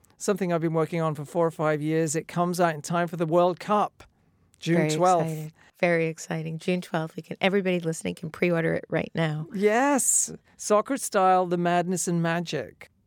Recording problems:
none

